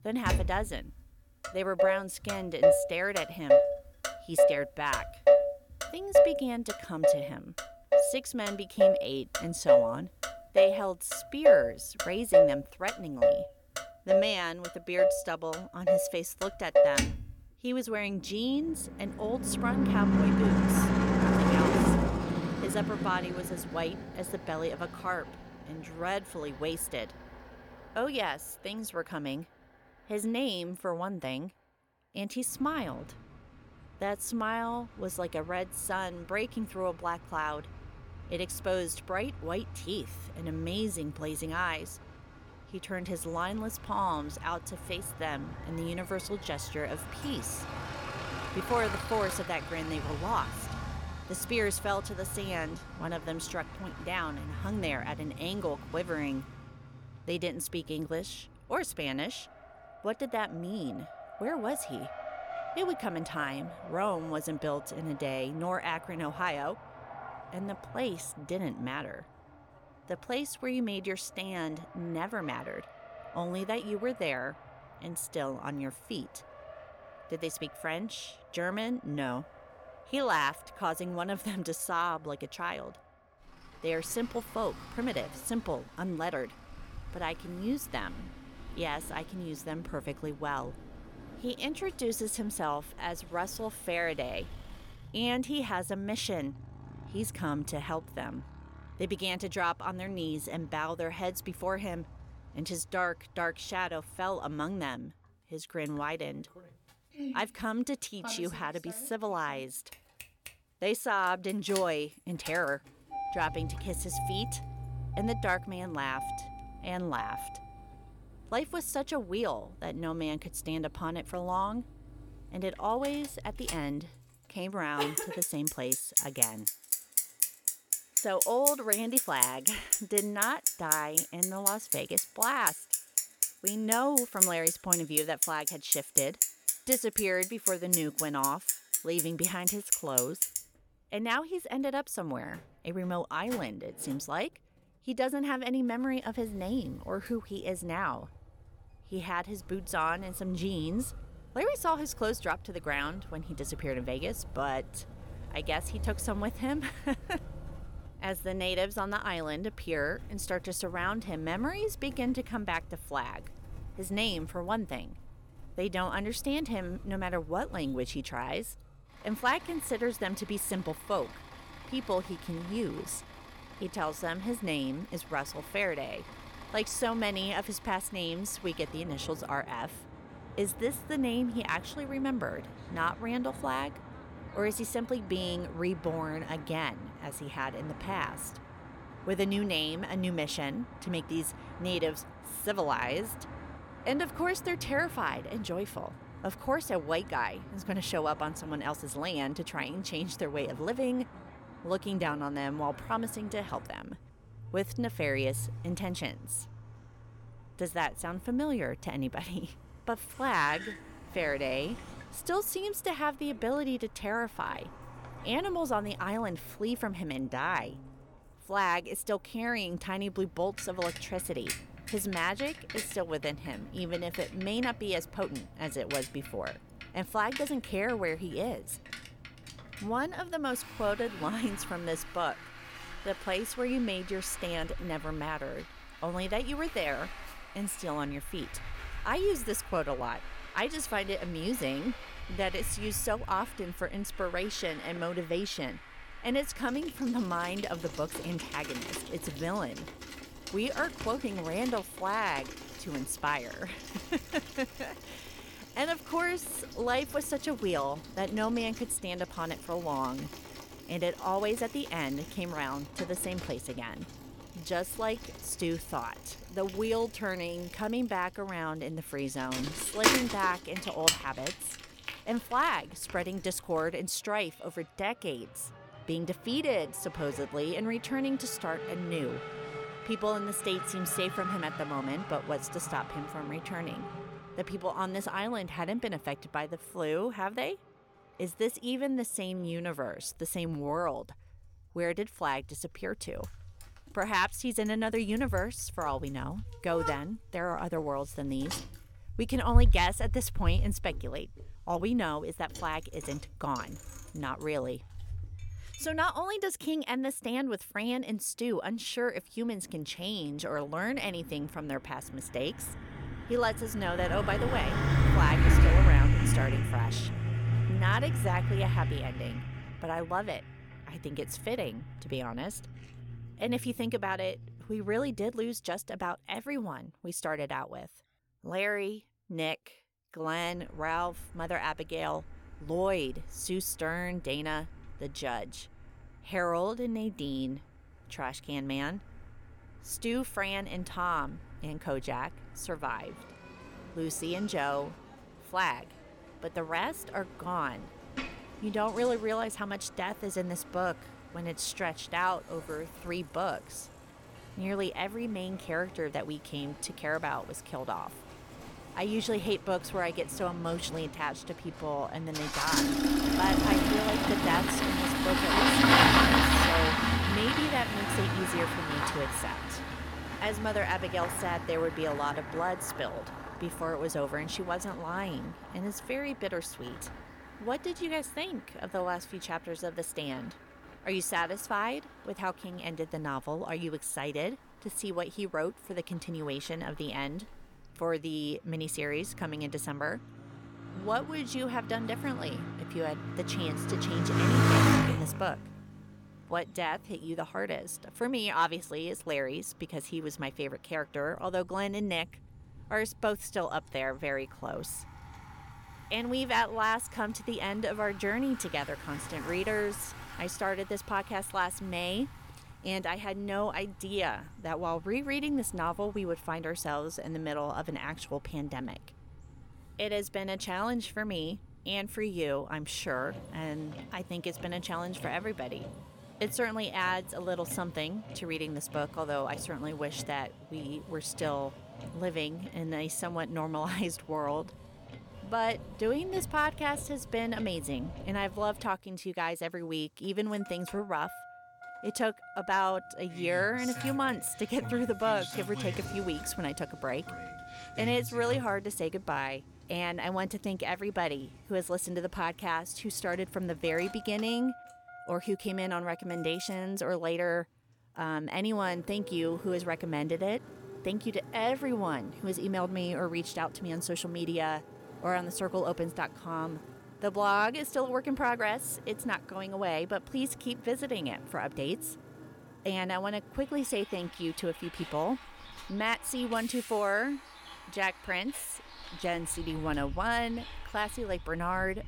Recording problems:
traffic noise; very loud; throughout; 2 dB above the speech

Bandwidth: 17.5 kHz